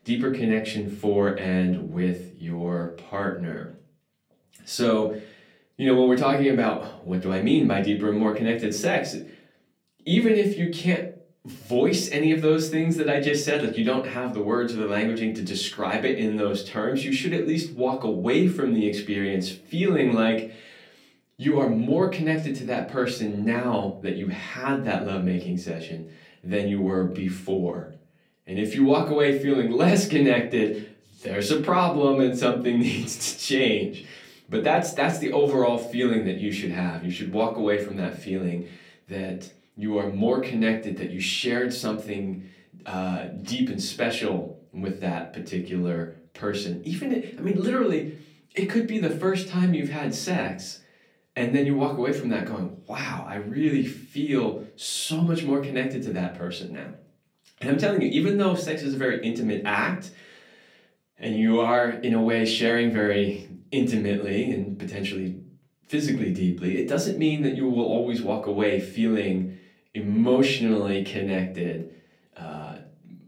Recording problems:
off-mic speech; far
room echo; very slight; dies away in 0.3 s

